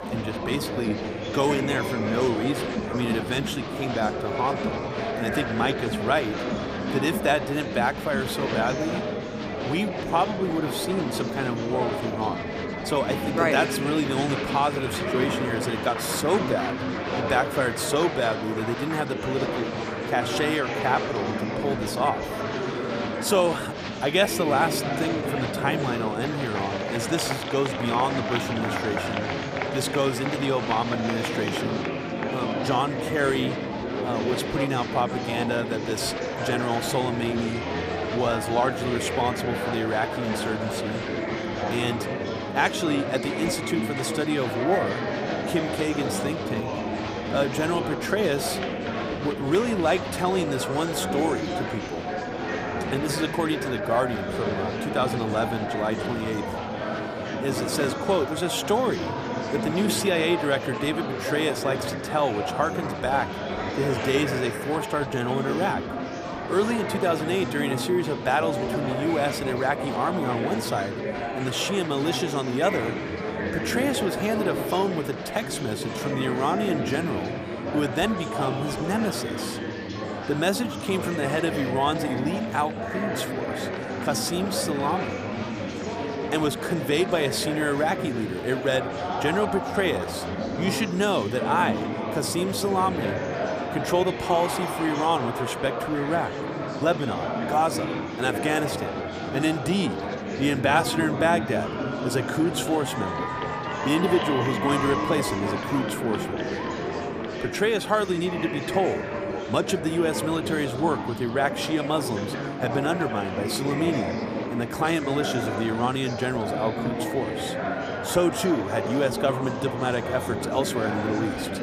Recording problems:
murmuring crowd; loud; throughout; 2 dB below the speech

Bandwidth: 14.5 kHz